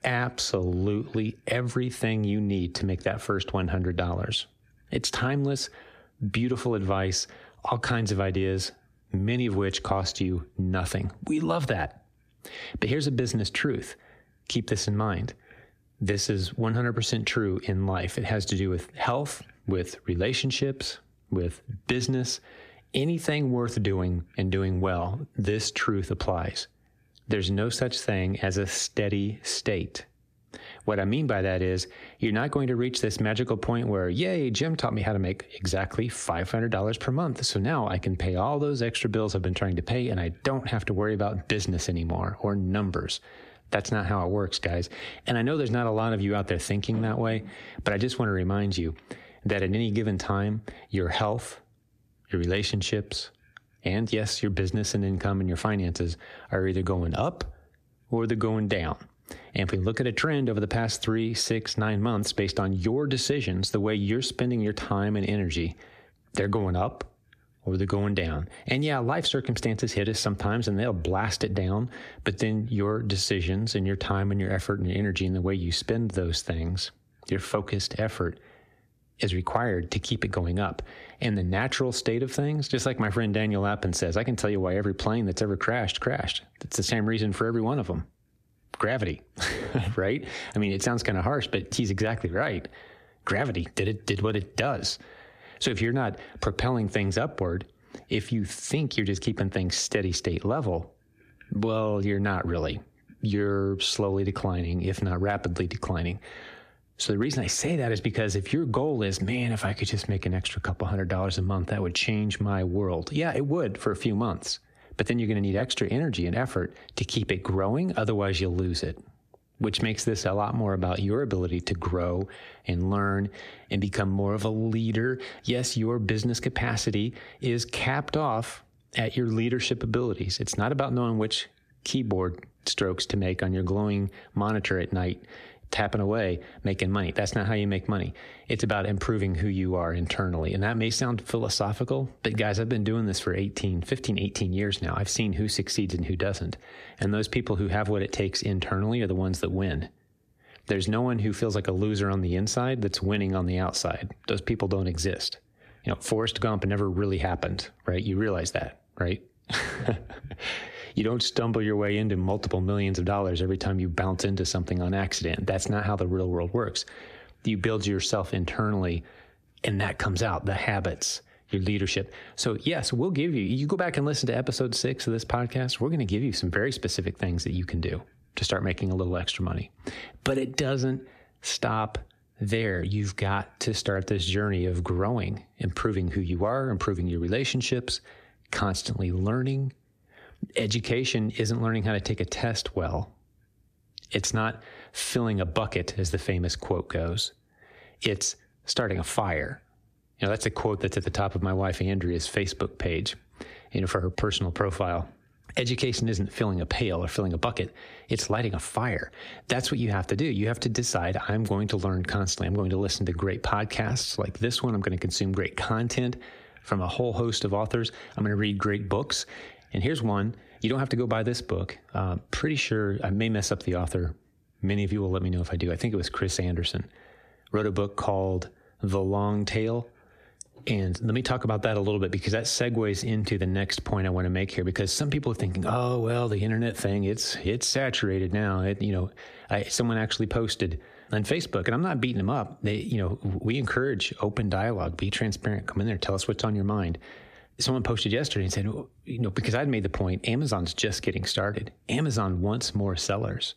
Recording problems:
squashed, flat; heavily

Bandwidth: 14.5 kHz